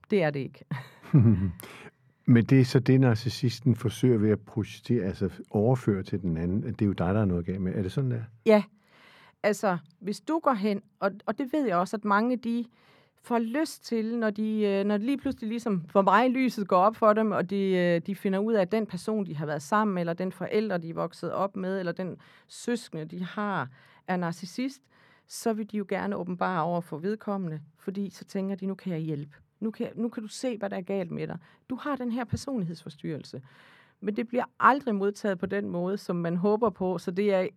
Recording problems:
muffled; slightly; fading above 2.5 kHz

